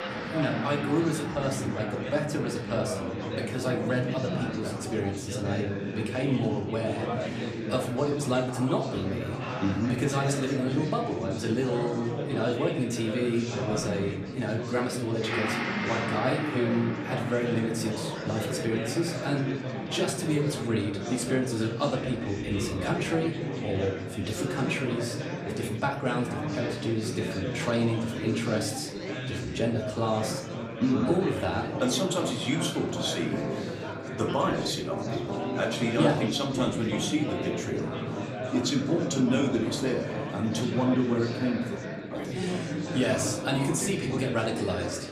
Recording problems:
room echo; slight; dies away in 0.5 s
off-mic speech; somewhat distant
background music; loud; throughout; 10 dB below the speech
chatter from many people; loud; throughout; 4 dB below the speech

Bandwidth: 14.5 kHz